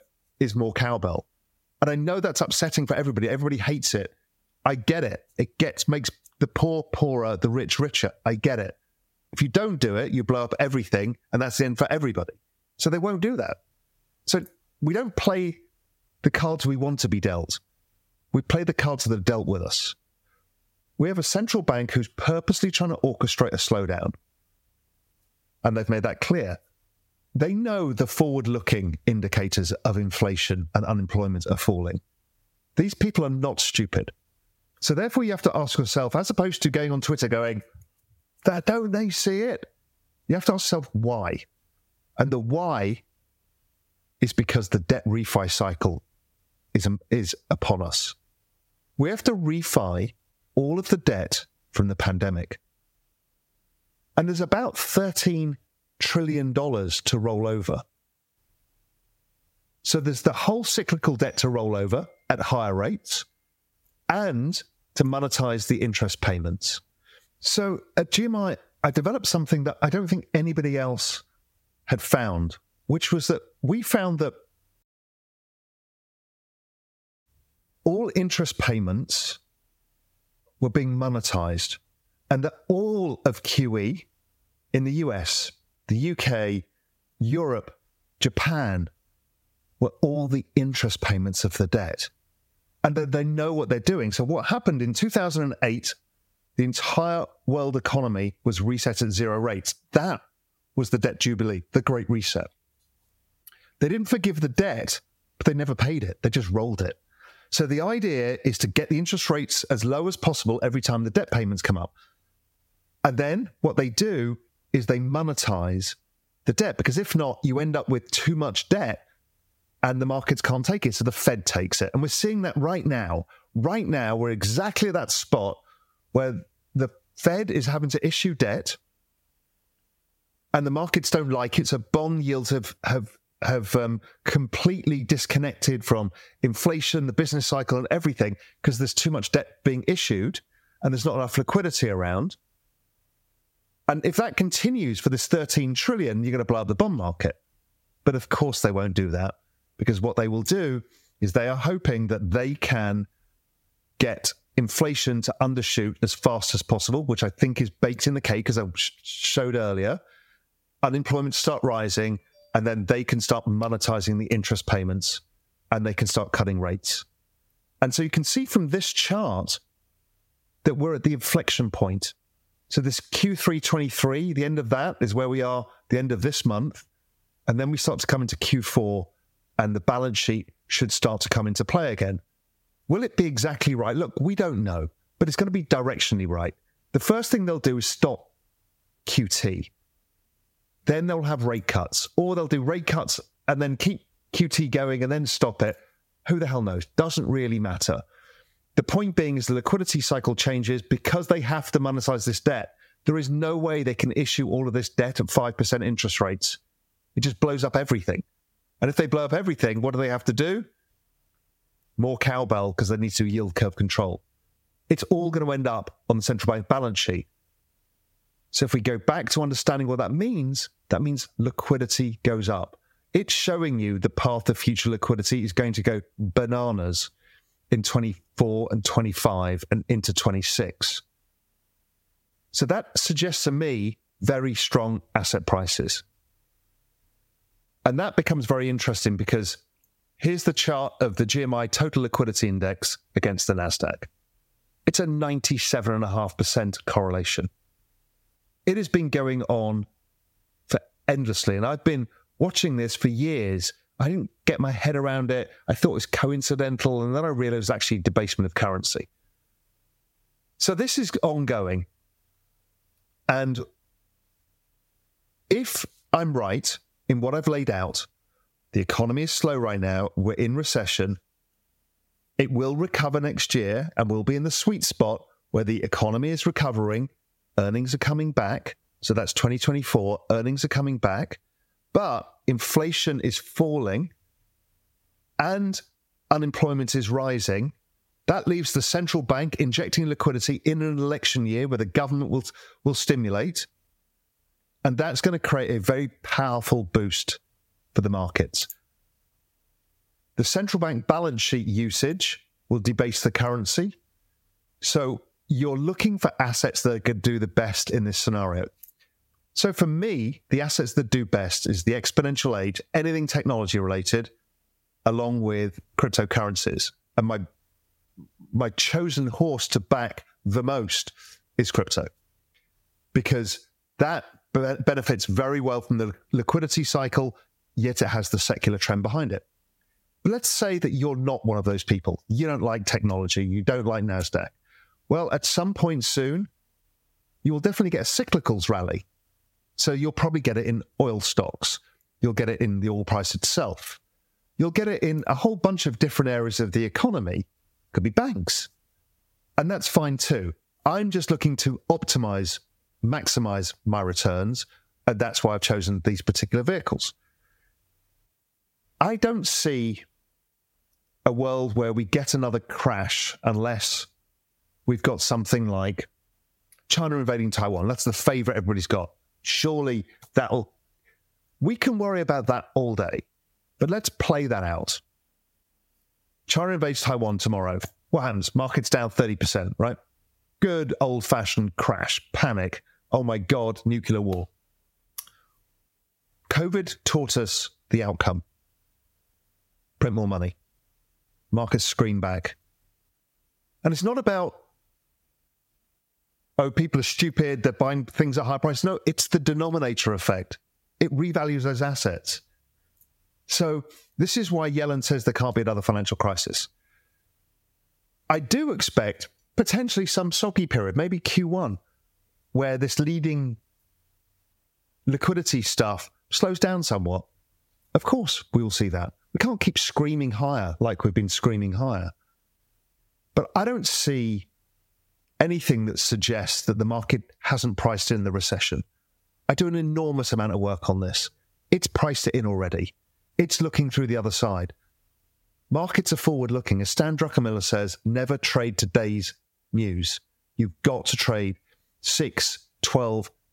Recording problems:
squashed, flat; somewhat

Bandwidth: 16 kHz